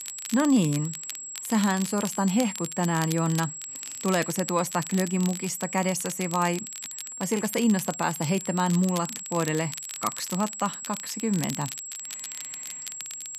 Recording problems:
high-pitched whine; loud; throughout; 7.5 kHz, 8 dB below the speech
crackle, like an old record; noticeable; 15 dB below the speech

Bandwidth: 14.5 kHz